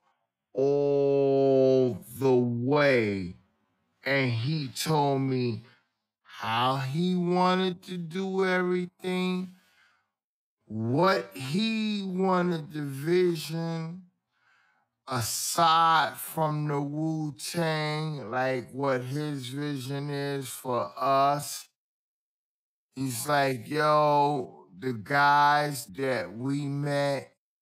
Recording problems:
wrong speed, natural pitch; too slow; 0.5 times normal speed

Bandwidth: 15.5 kHz